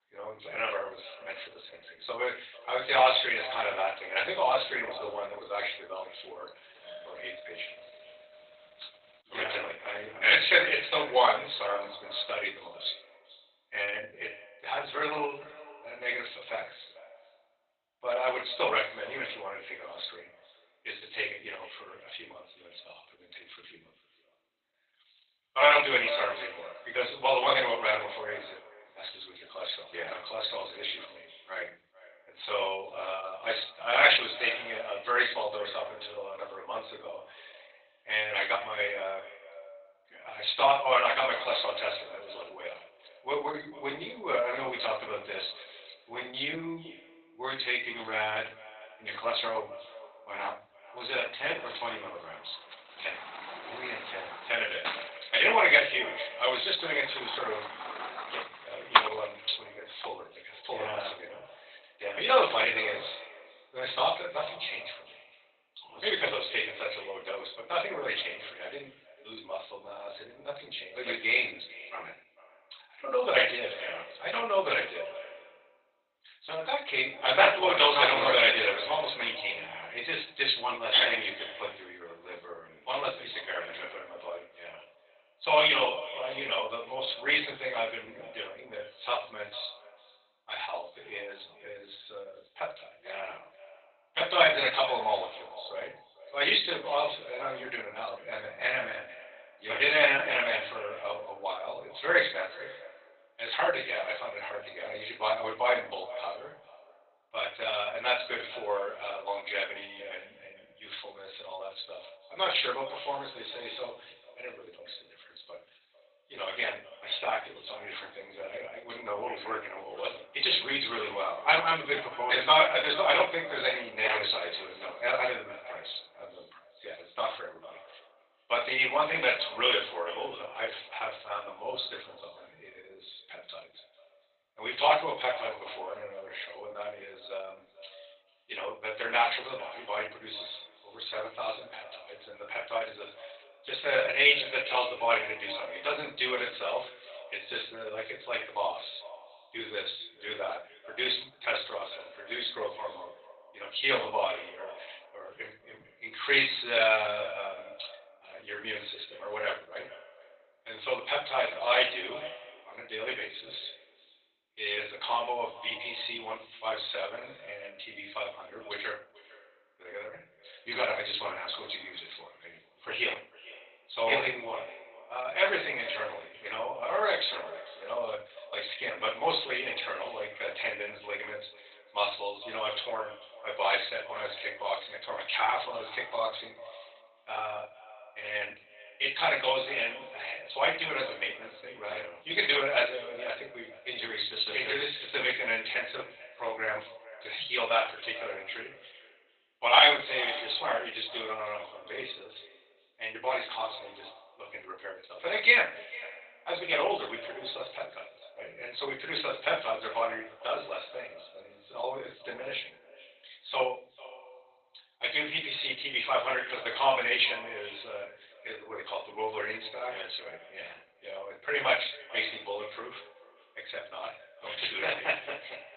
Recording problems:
off-mic speech; far
garbled, watery; badly; nothing above 4 kHz
thin; very; fading below 900 Hz
echo of what is said; noticeable; throughout; 450 ms later, 15 dB below the speech
room echo; slight; dies away in 0.3 s
doorbell; faint; from 7 to 9 s; peak 15 dB below the speech
door banging; loud; from 55 to 59 s; peak 5 dB above the speech

